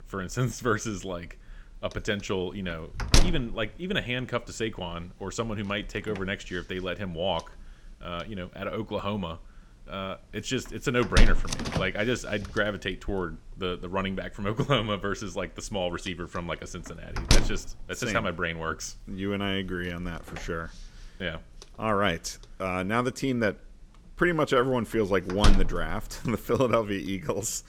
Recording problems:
household noises; very loud; throughout; as loud as the speech

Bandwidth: 17.5 kHz